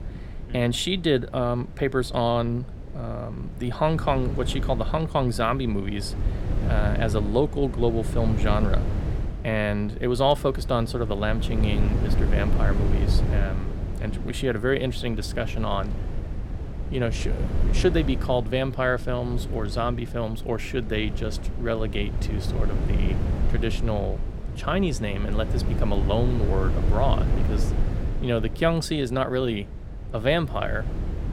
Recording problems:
wind noise on the microphone; occasional gusts; 10 dB below the speech

